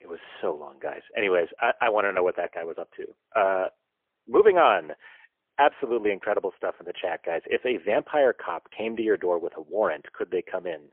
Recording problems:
phone-call audio; poor line; nothing above 3 kHz

